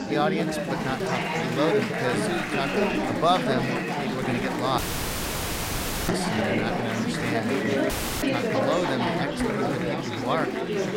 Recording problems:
chatter from many people; very loud; throughout; 3 dB above the speech
animal sounds; faint; throughout; 25 dB below the speech
audio cutting out; at 5 s for 1.5 s and at 8 s

